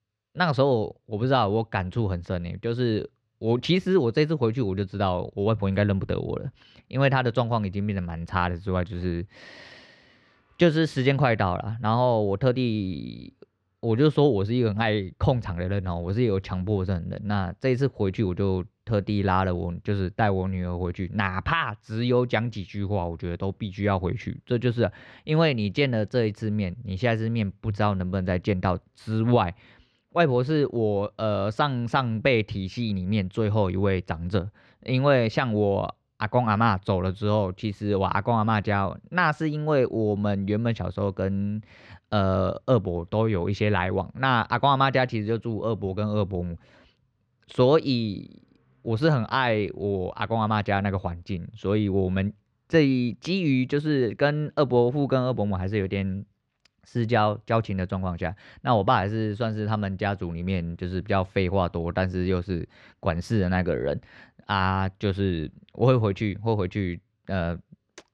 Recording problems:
muffled; slightly; fading above 2.5 kHz

